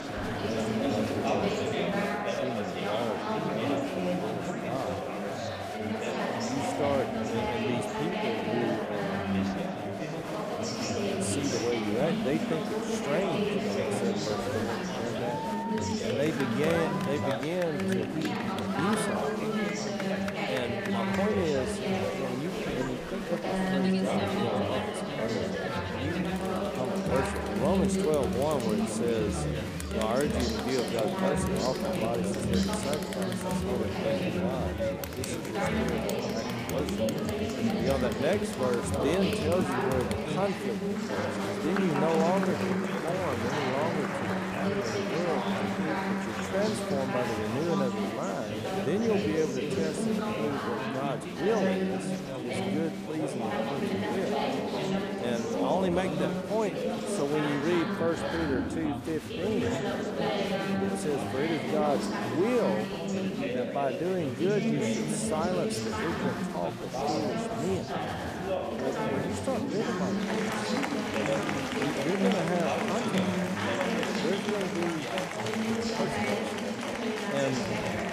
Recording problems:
chatter from many people; very loud; throughout; 3 dB above the speech

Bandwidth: 15 kHz